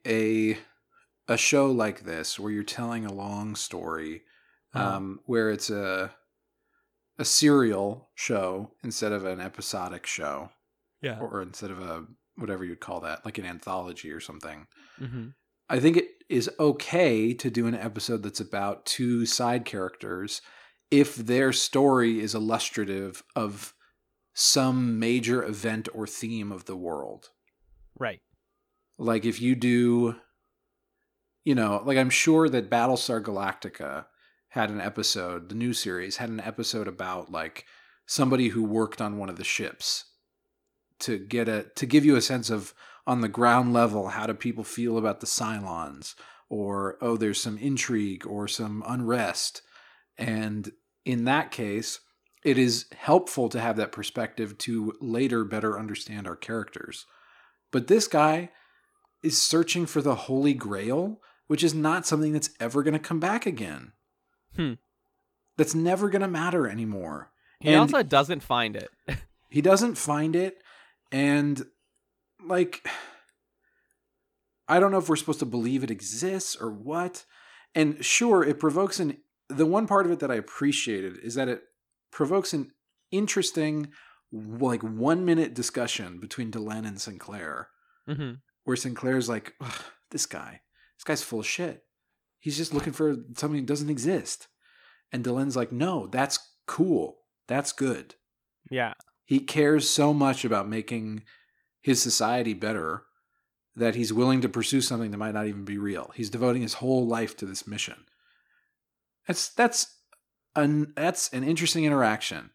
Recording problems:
none

